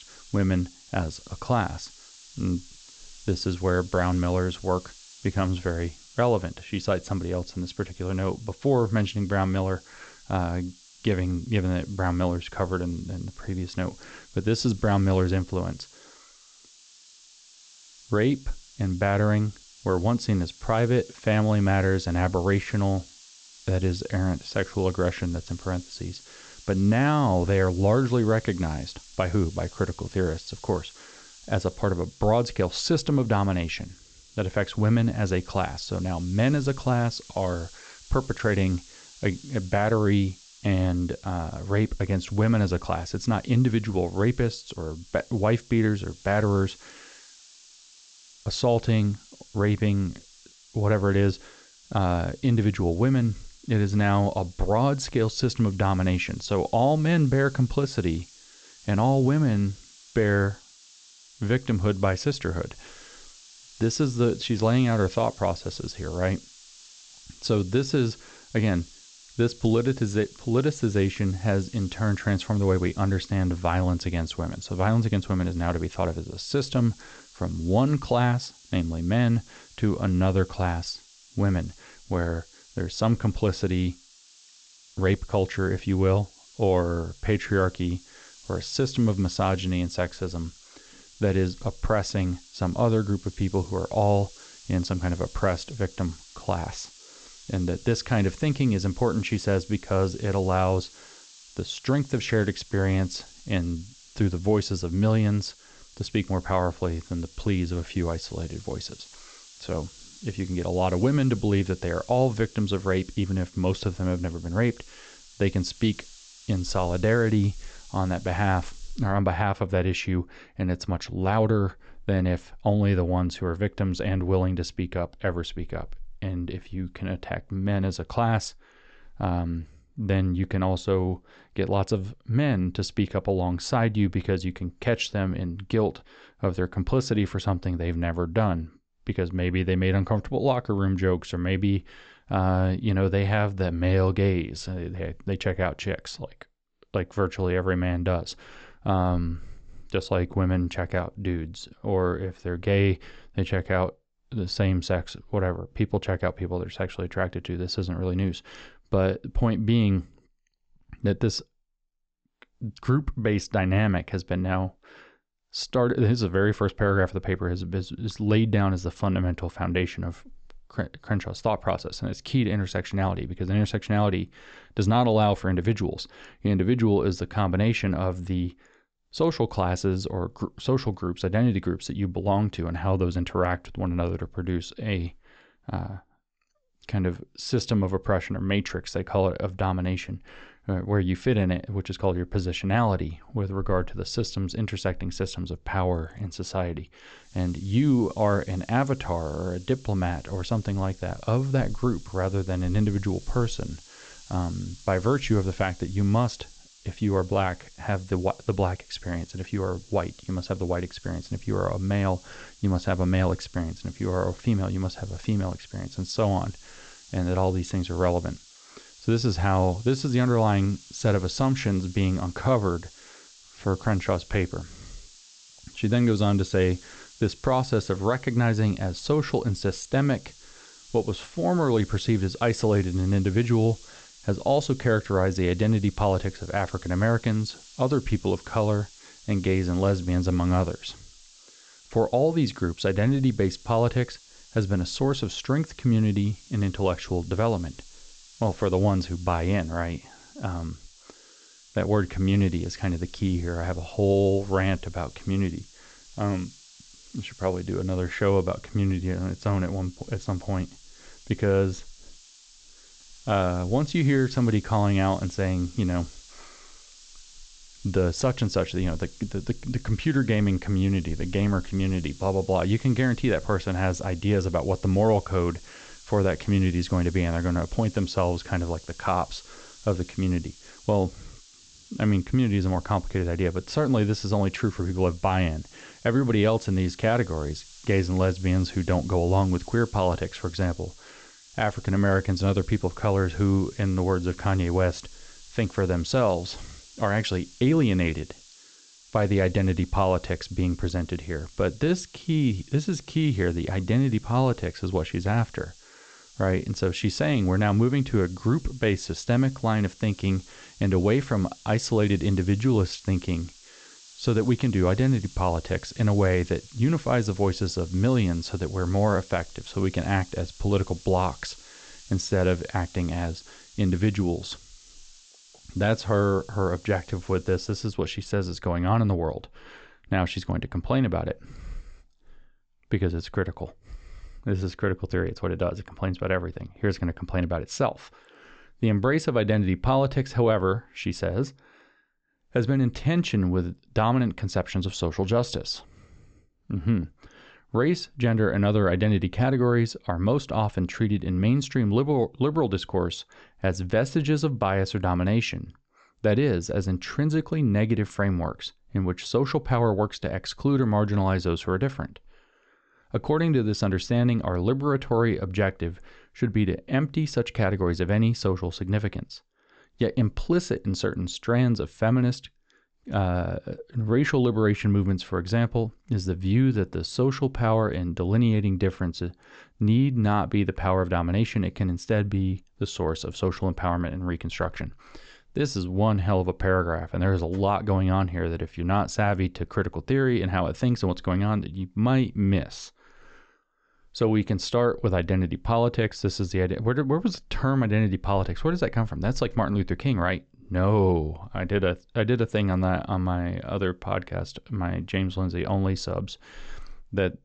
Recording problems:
high frequencies cut off; noticeable; nothing above 8 kHz
hiss; faint; until 1:59 and from 3:17 to 5:28; 25 dB below the speech

